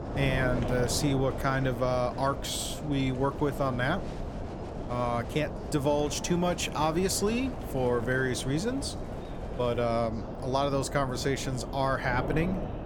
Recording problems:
wind noise on the microphone; heavy; 10 dB below the speech
chatter from many people; noticeable; throughout; 20 dB below the speech

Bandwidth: 17 kHz